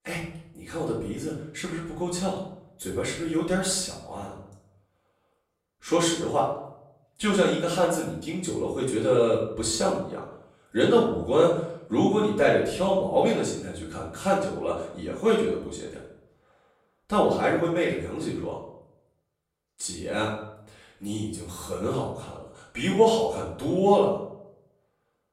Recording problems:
off-mic speech; far
room echo; noticeable; dies away in 0.6 s

